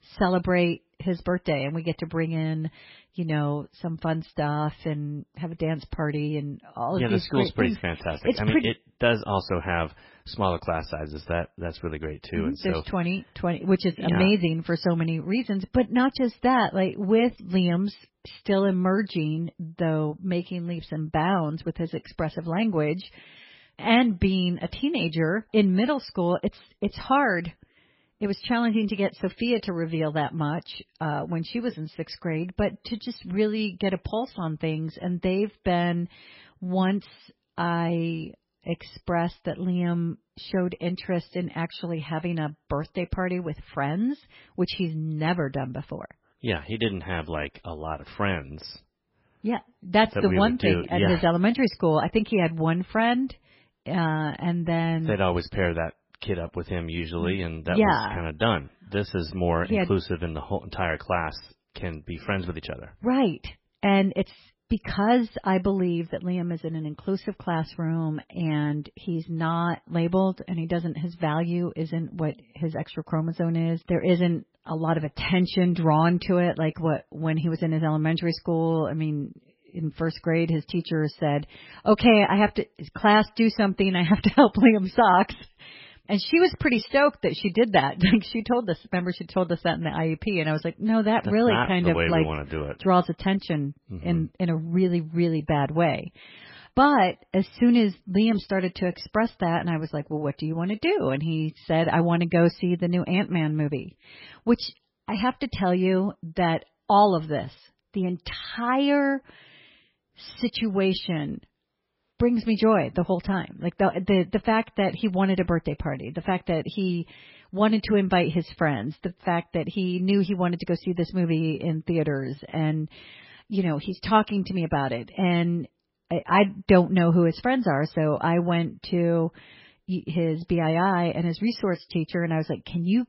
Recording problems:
garbled, watery; badly; nothing above 5.5 kHz

